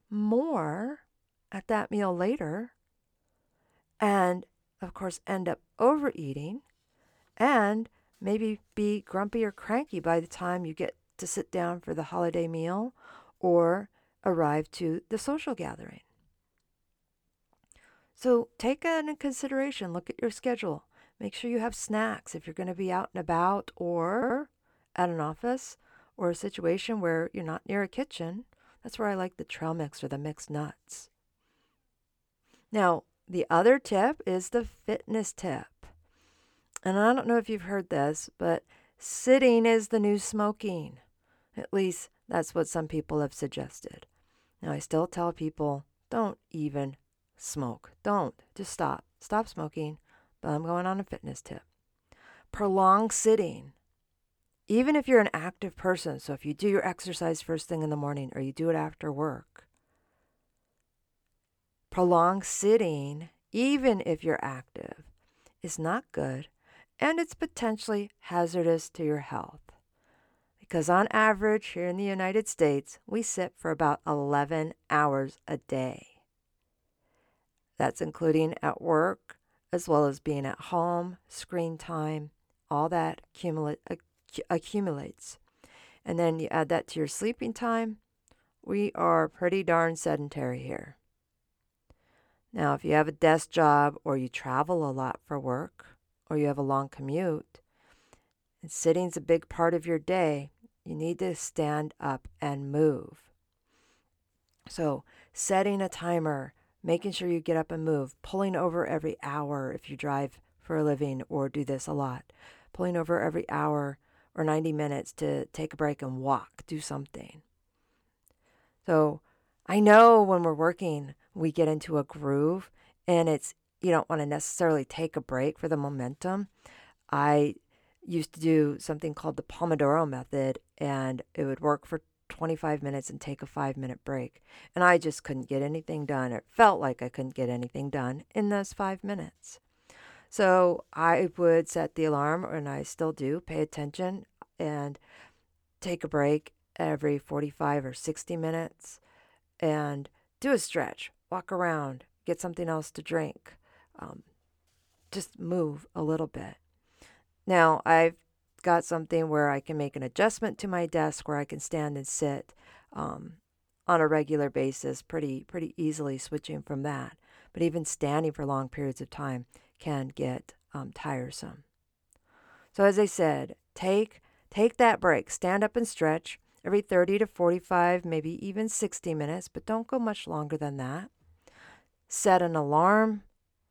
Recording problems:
audio stuttering; at 24 s

